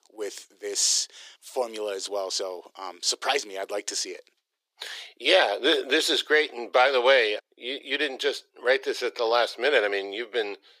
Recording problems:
thin; very; fading below 400 Hz

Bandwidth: 15 kHz